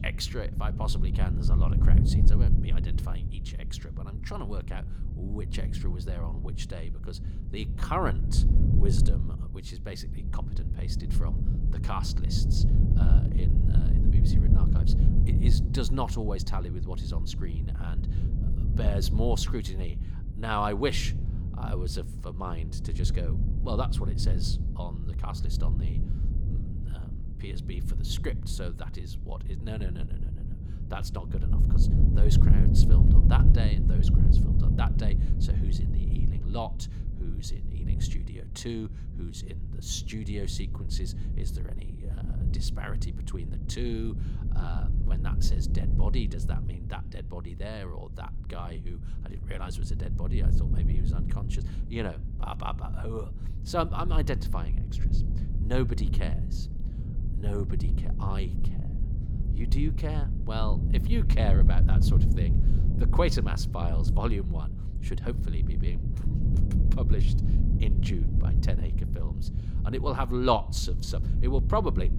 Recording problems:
low rumble; loud; throughout; 6 dB below the speech

